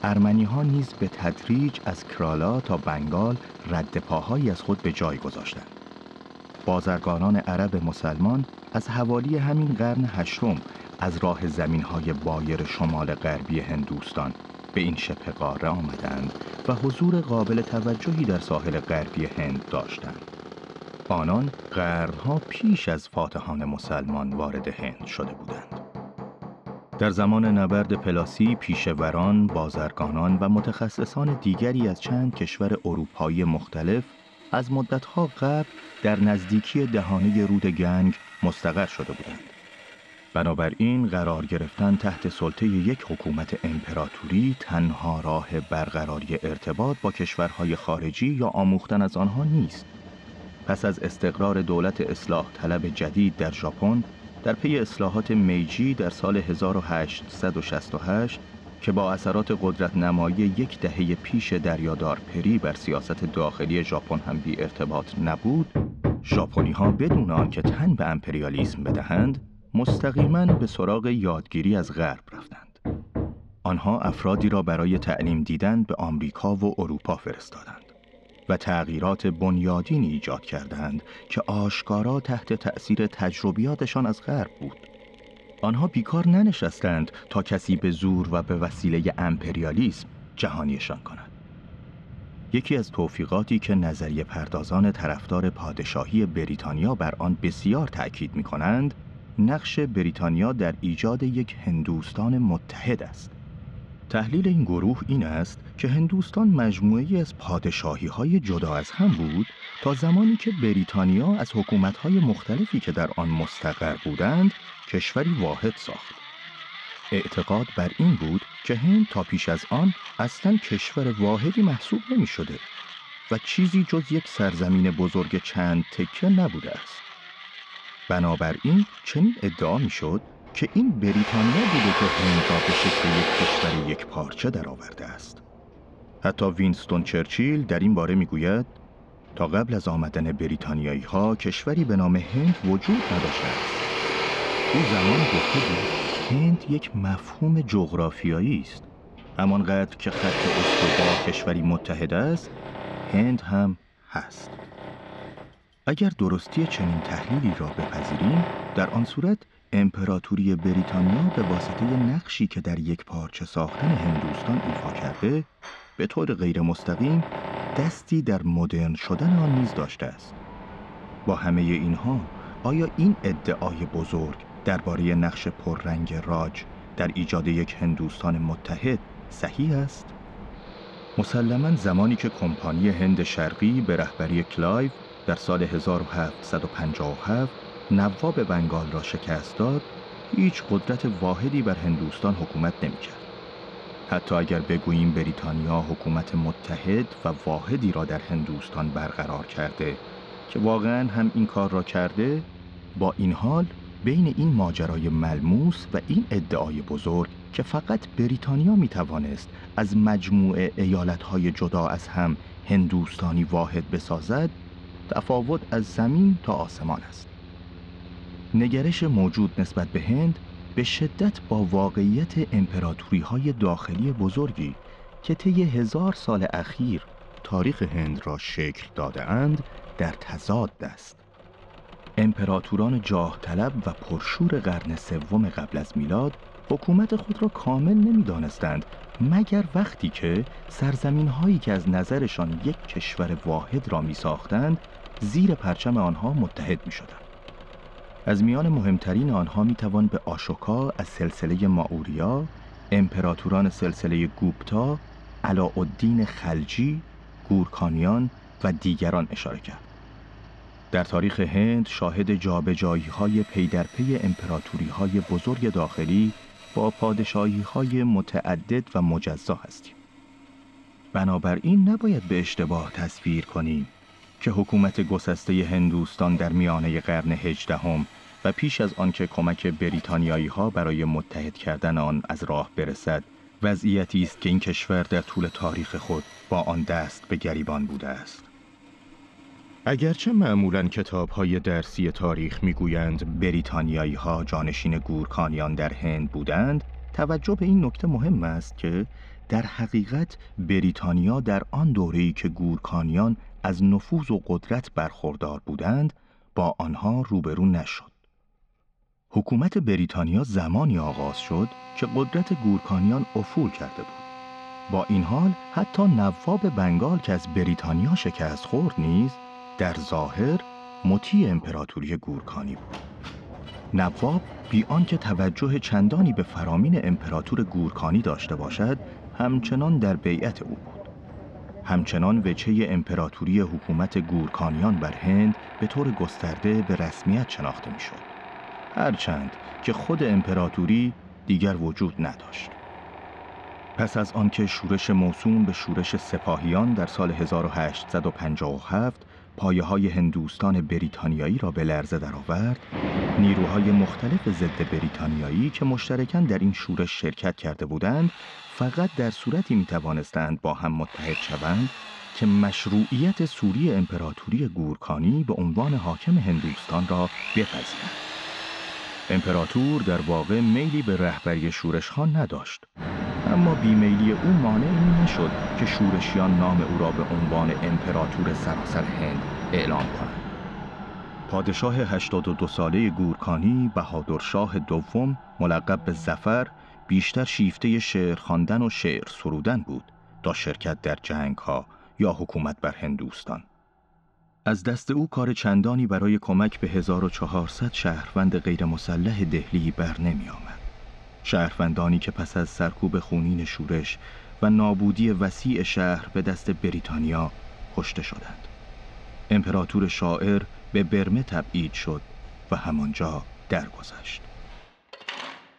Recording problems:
muffled; slightly; fading above 4 kHz
machinery noise; noticeable; throughout; 10 dB below the speech

